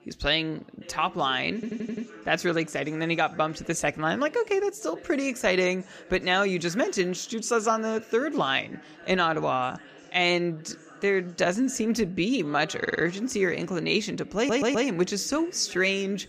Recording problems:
background chatter; faint; throughout; 3 voices, 20 dB below the speech
audio stuttering; at 1.5 s, at 13 s and at 14 s

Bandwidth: 14.5 kHz